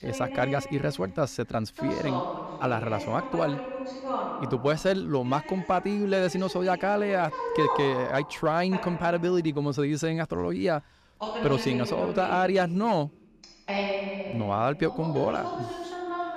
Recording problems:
voice in the background; loud; throughout; 7 dB below the speech

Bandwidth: 14.5 kHz